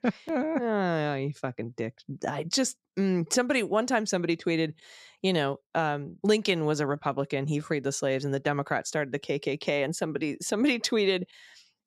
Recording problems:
none

